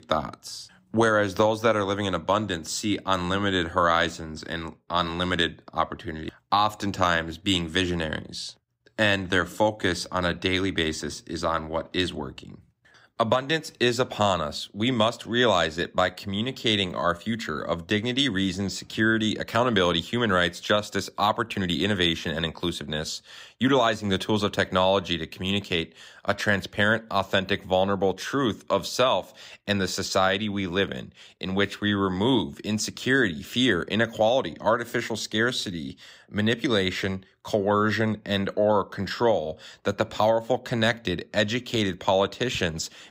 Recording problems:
none

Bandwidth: 15.5 kHz